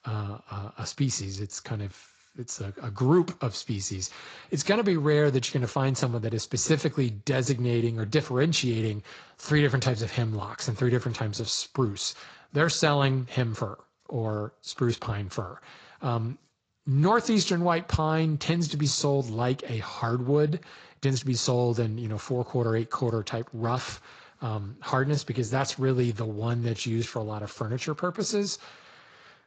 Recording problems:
garbled, watery; slightly; nothing above 7.5 kHz

